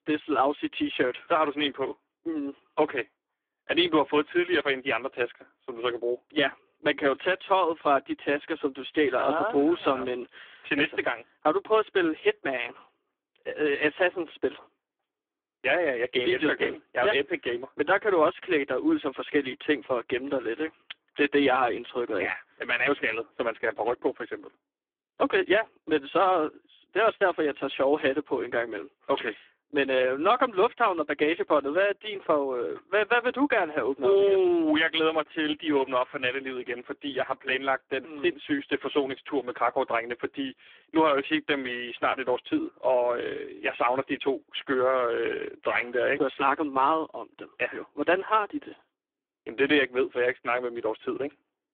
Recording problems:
phone-call audio; poor line; nothing above 3.5 kHz

